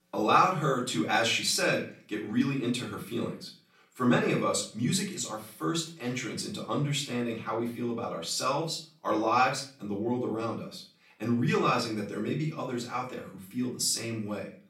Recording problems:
off-mic speech; far
room echo; slight; dies away in 0.4 s

